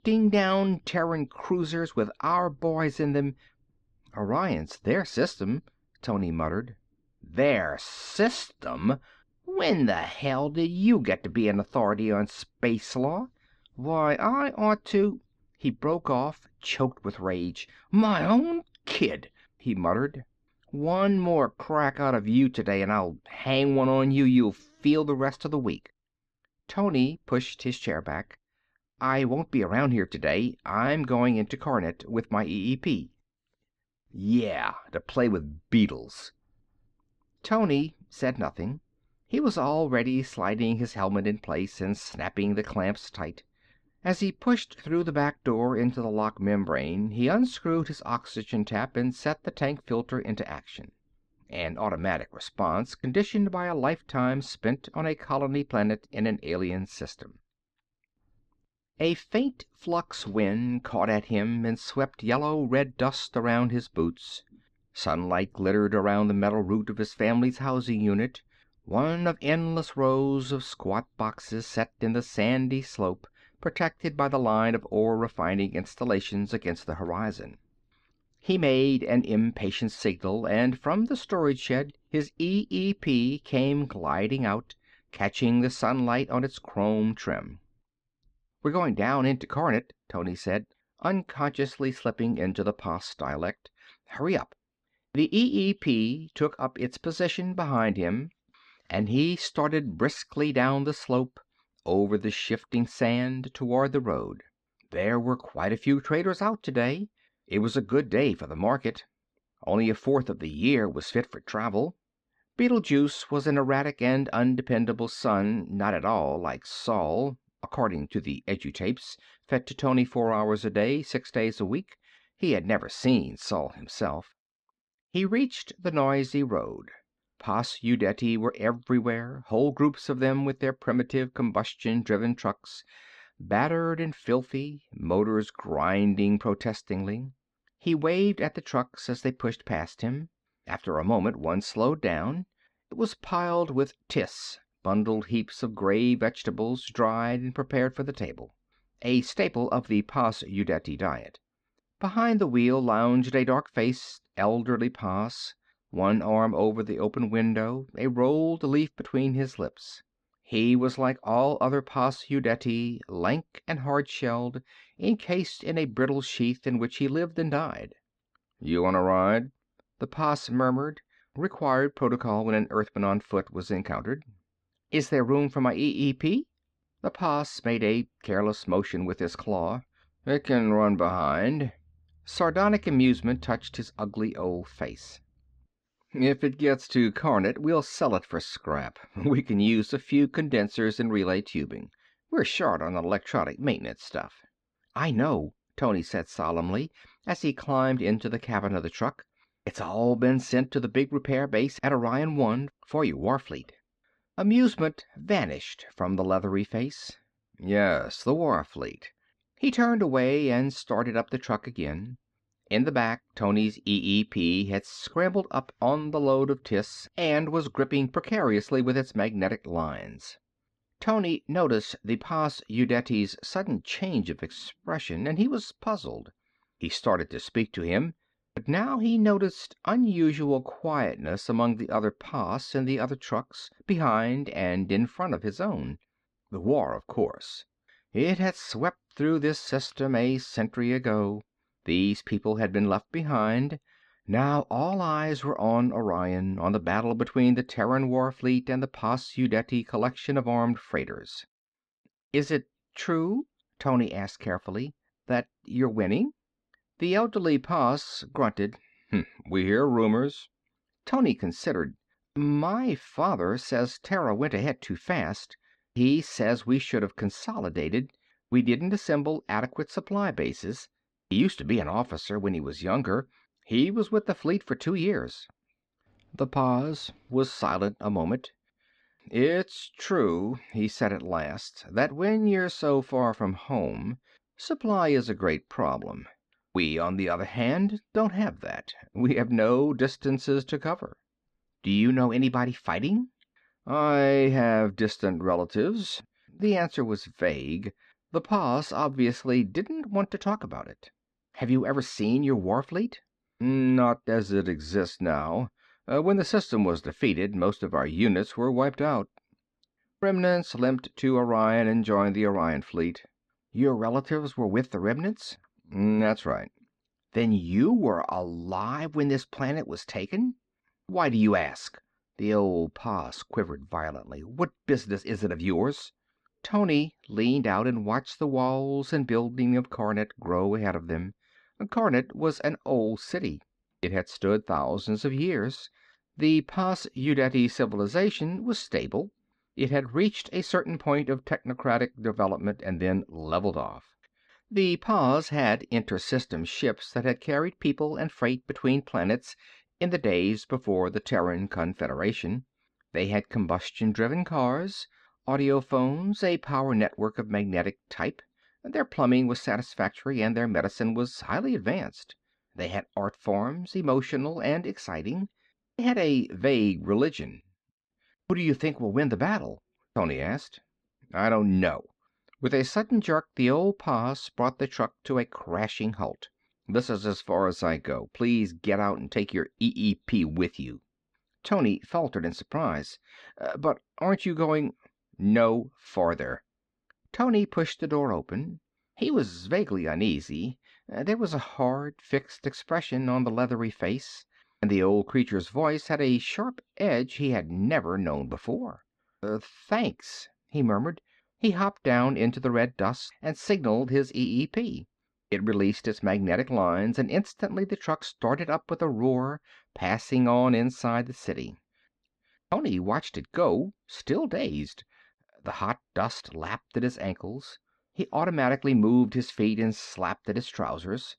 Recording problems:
muffled; slightly; fading above 4 kHz

